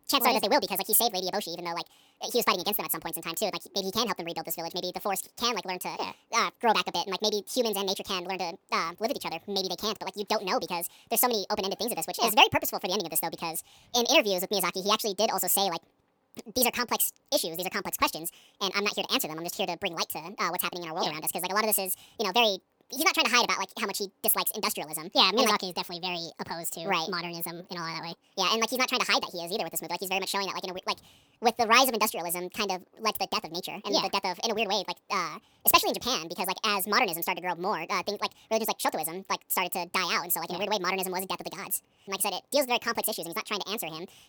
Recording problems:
wrong speed and pitch; too fast and too high; 1.6 times normal speed

